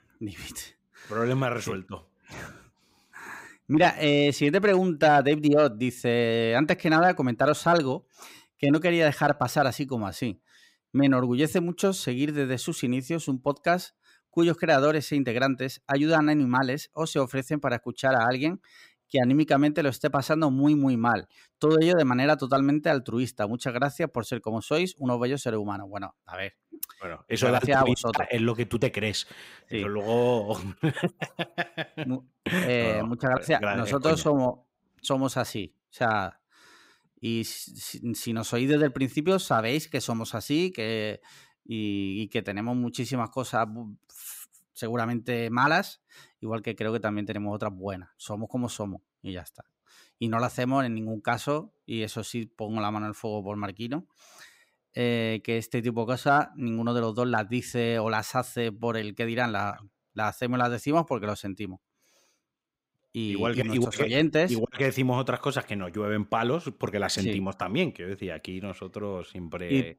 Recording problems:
none

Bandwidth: 15.5 kHz